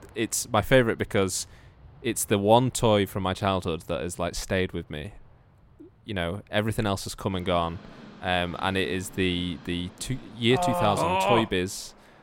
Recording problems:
train or aircraft noise; faint; throughout; 25 dB below the speech

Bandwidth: 16.5 kHz